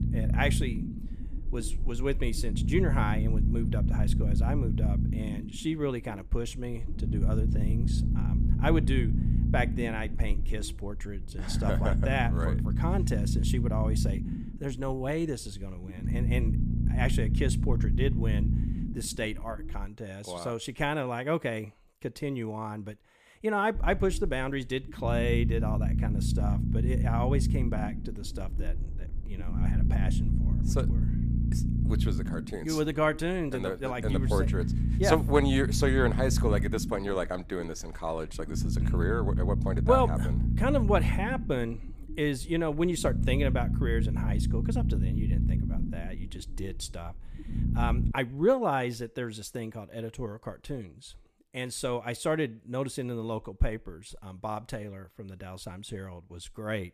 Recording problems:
low rumble; loud; until 20 s and from 24 to 48 s; 9 dB below the speech

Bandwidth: 14.5 kHz